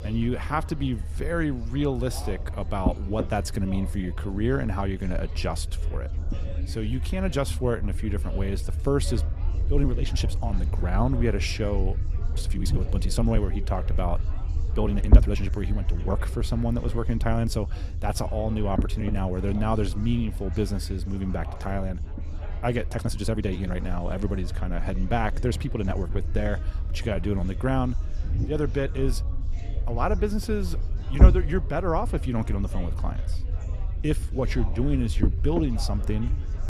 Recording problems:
chatter from many people; noticeable; throughout; 20 dB below the speech
low rumble; noticeable; throughout; 15 dB below the speech
uneven, jittery; strongly; from 9.5 to 34 s

